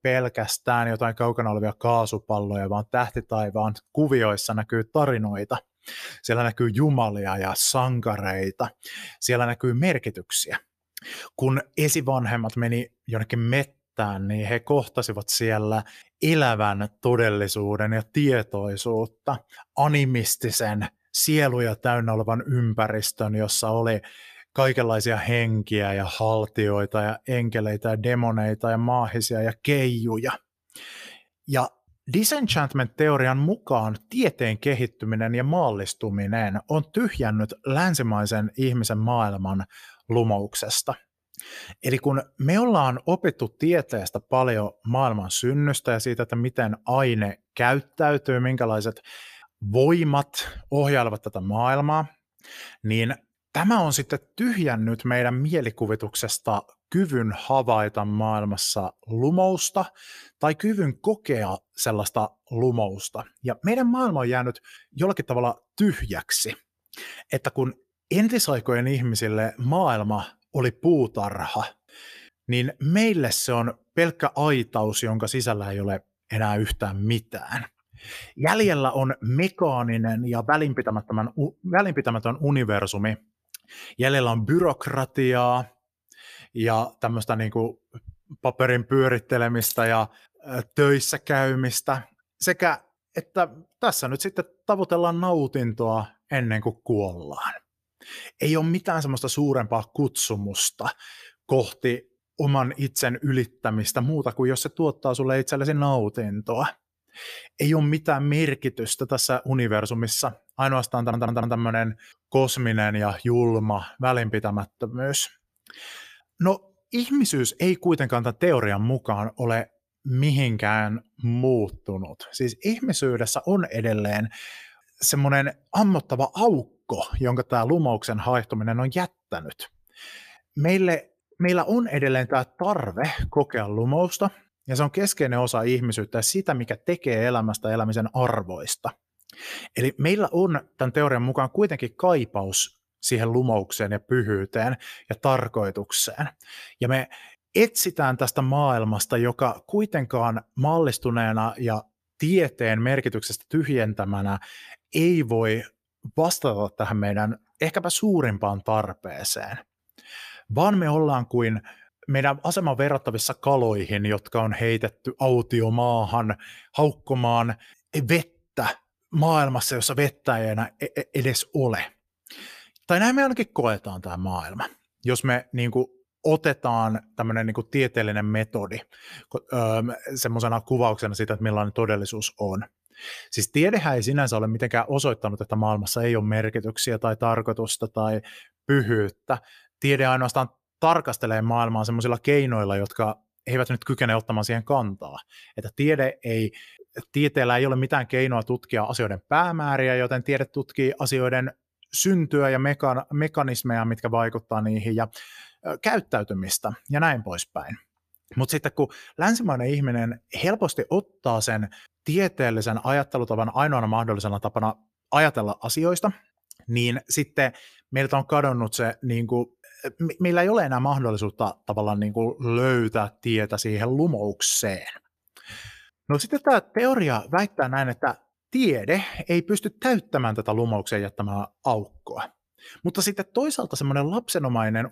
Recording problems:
jangling keys; noticeable; at 1:30; peak 5 dB below the speech
audio stuttering; at 1:51

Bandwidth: 14.5 kHz